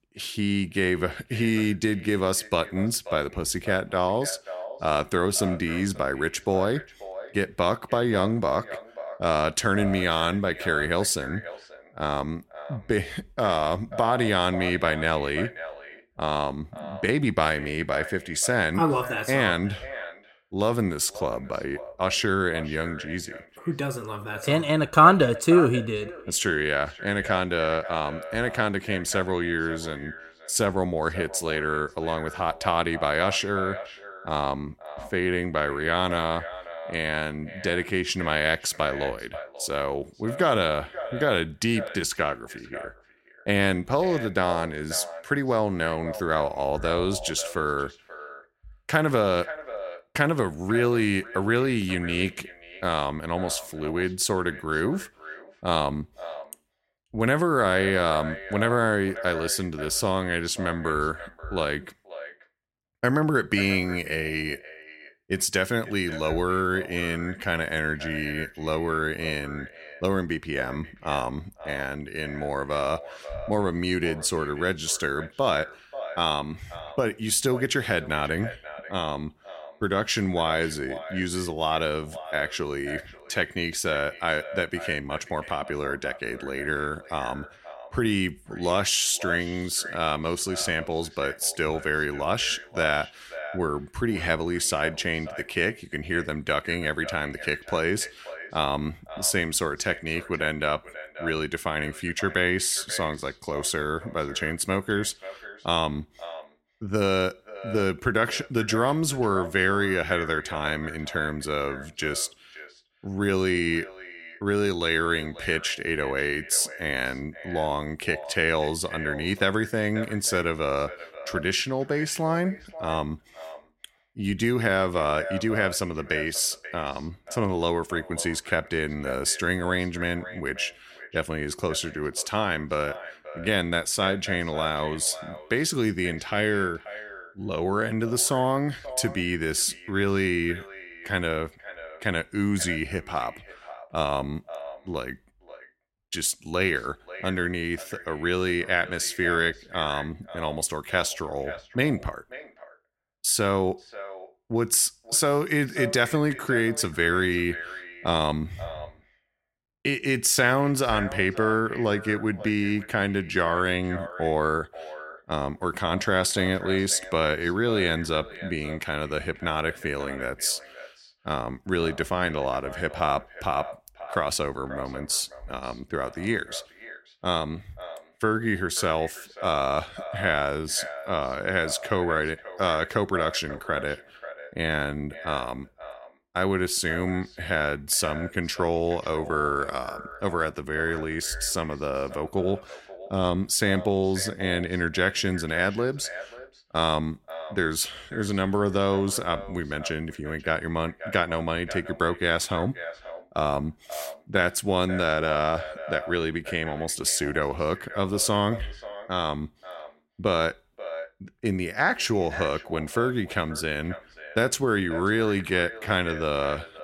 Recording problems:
echo of what is said; noticeable; throughout; 540 ms later, 15 dB below the speech

